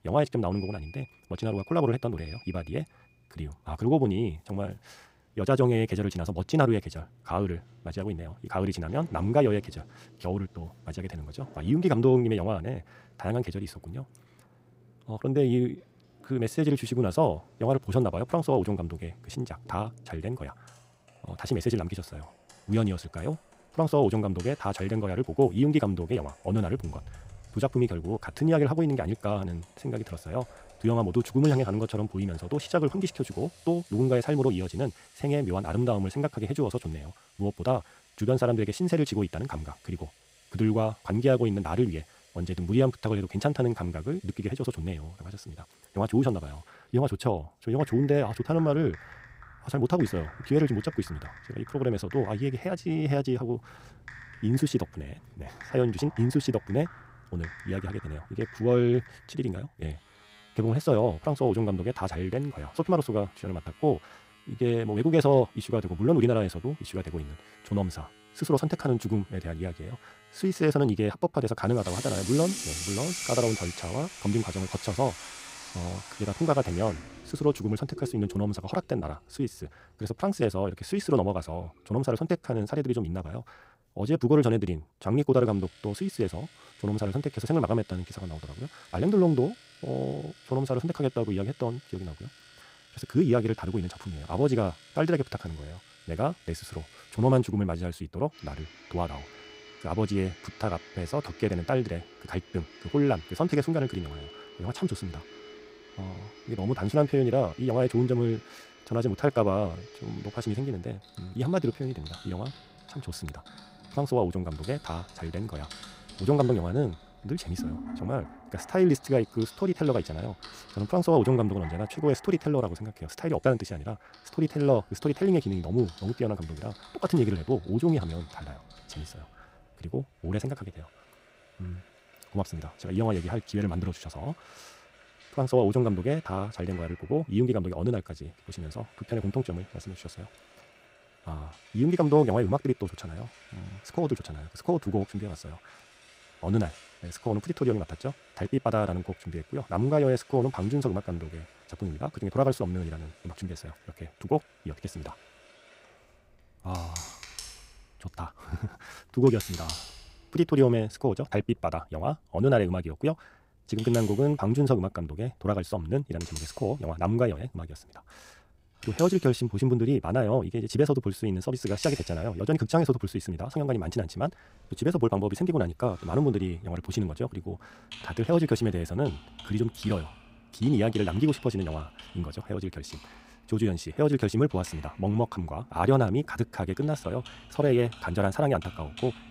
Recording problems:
wrong speed, natural pitch; too fast; 1.6 times normal speed
household noises; noticeable; throughout; 20 dB below the speech

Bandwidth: 15.5 kHz